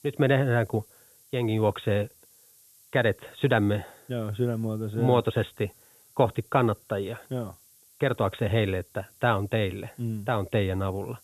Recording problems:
high frequencies cut off; severe; nothing above 4 kHz
hiss; faint; throughout; 25 dB below the speech

